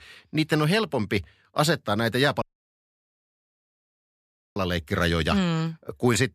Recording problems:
audio cutting out; at 2.5 s for 2 s

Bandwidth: 14.5 kHz